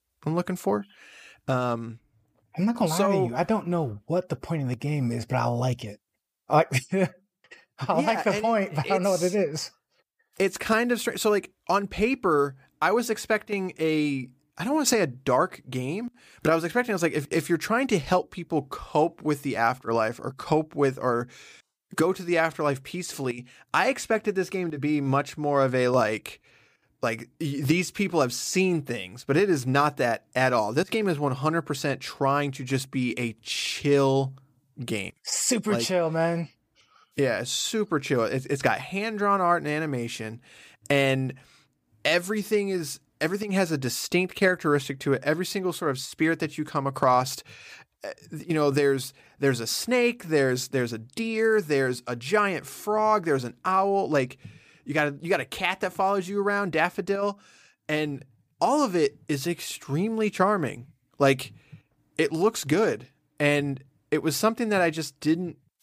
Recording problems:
none

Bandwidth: 15 kHz